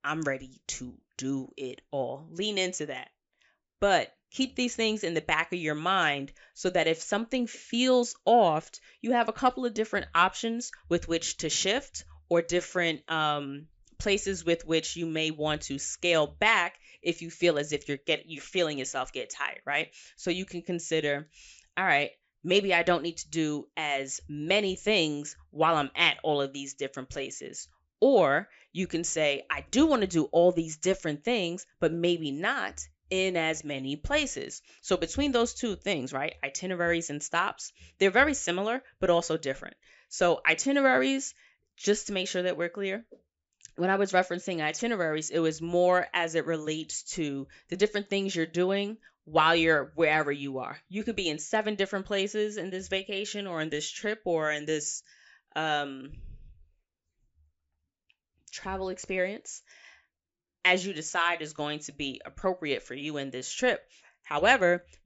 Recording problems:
high frequencies cut off; noticeable; nothing above 8 kHz

